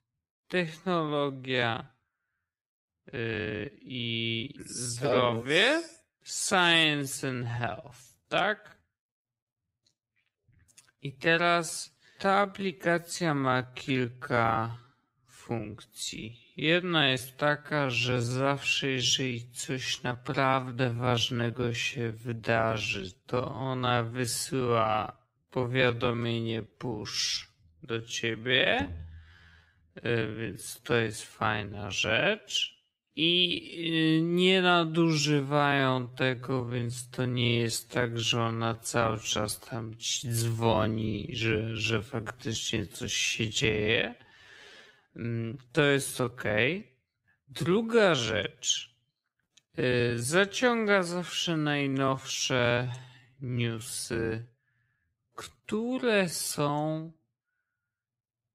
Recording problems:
wrong speed, natural pitch; too slow; 0.5 times normal speed

